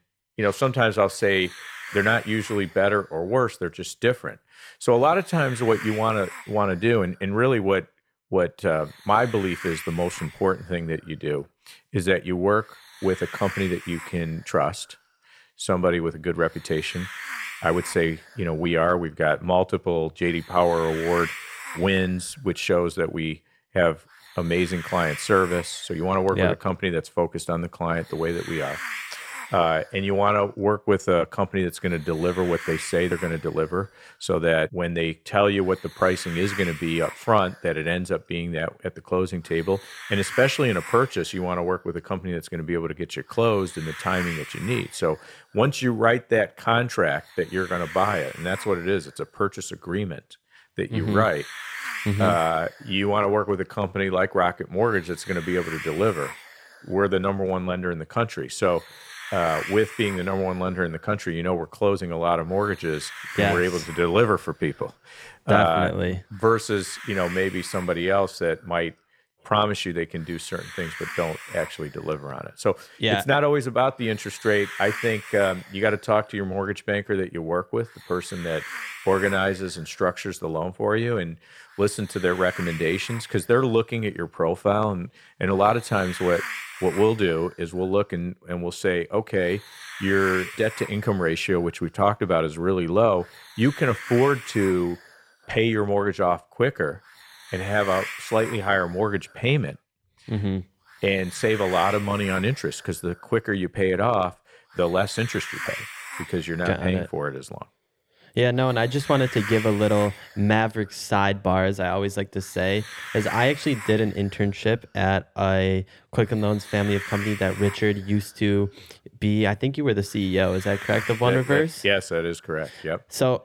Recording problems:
hiss; noticeable; throughout; 10 dB below the speech

